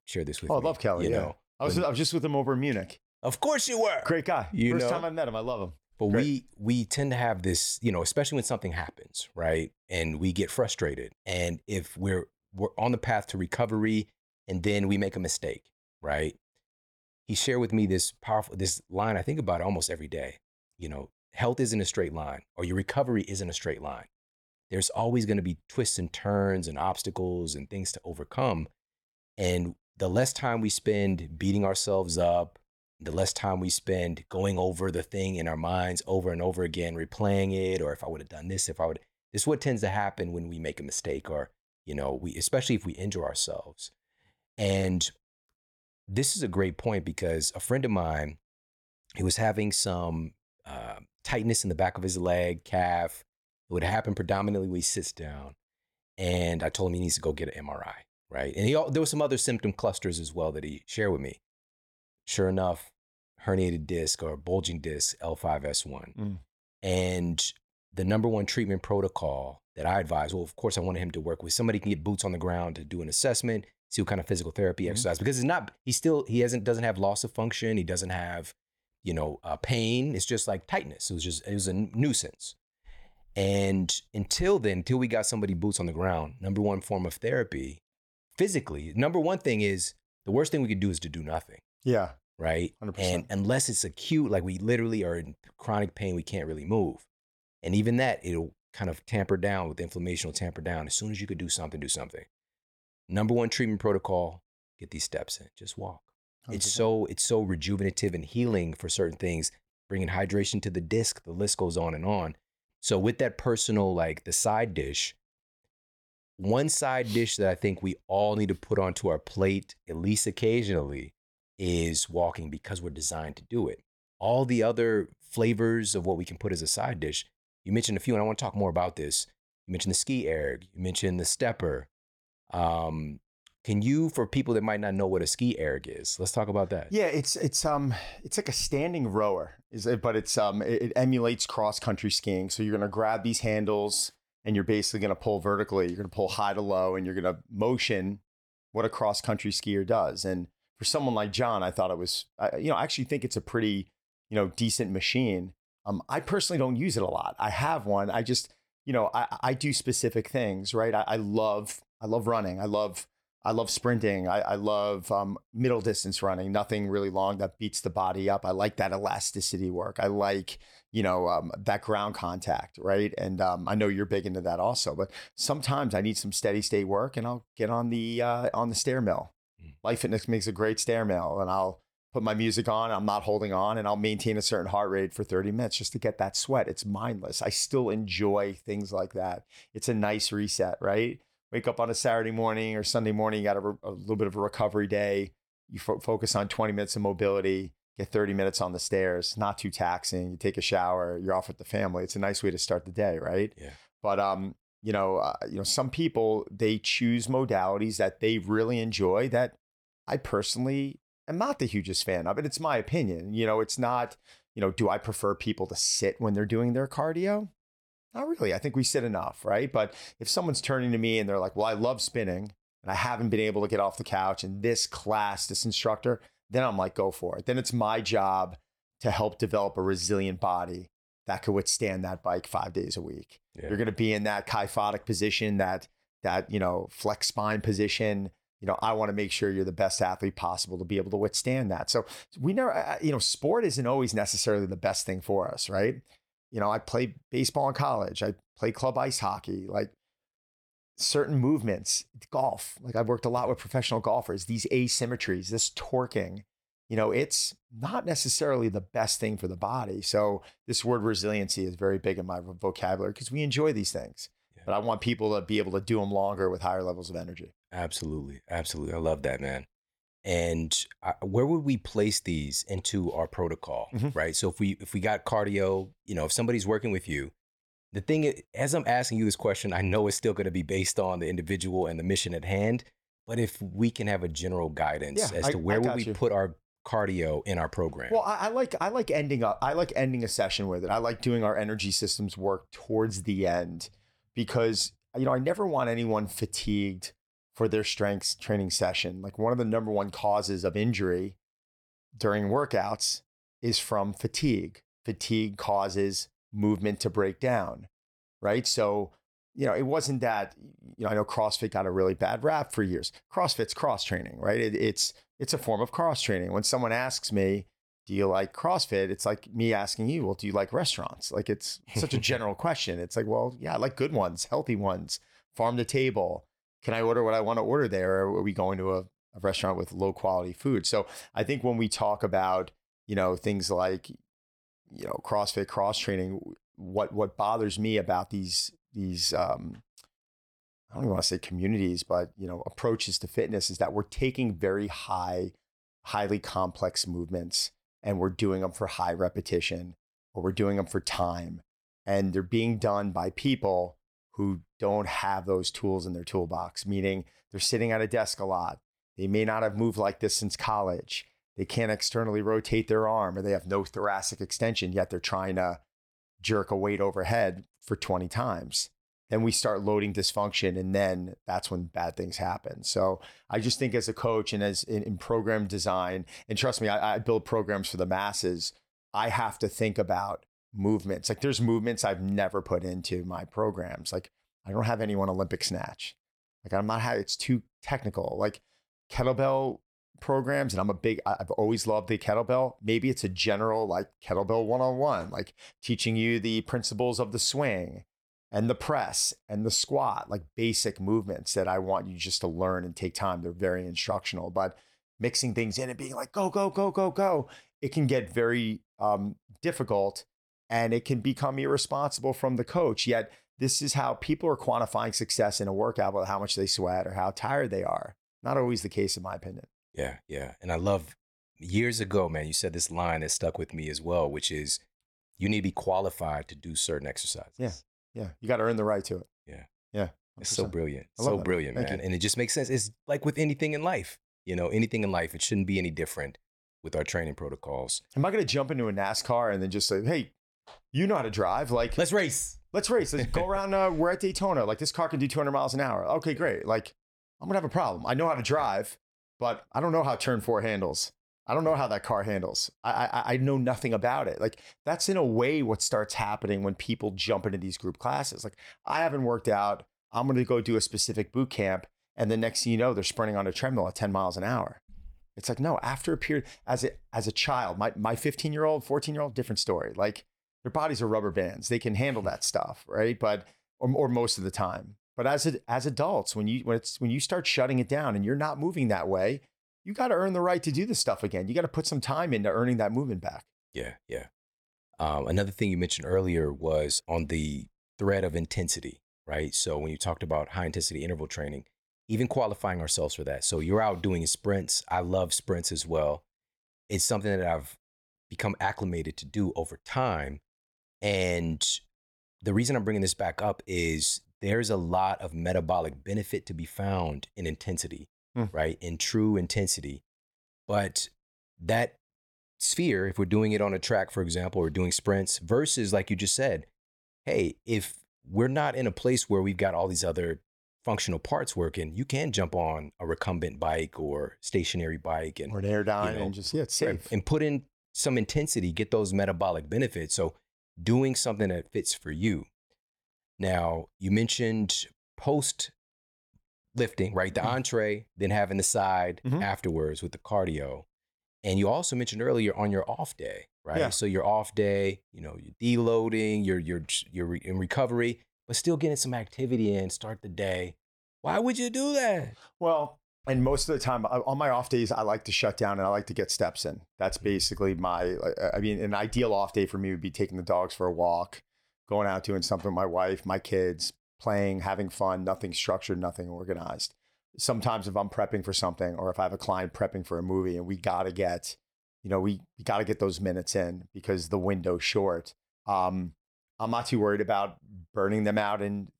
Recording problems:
none

